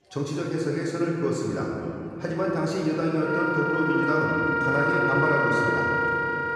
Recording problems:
off-mic speech; far
room echo; noticeable; dies away in 3 s
background music; very loud; throughout; 2 dB above the speech
chatter from many people; faint; throughout; 25 dB below the speech

